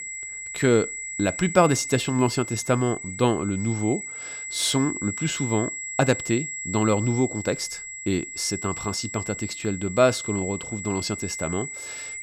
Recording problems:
high-pitched whine; loud; throughout; 2 kHz, 7 dB below the speech

